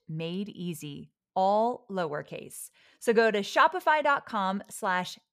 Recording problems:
none

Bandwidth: 15 kHz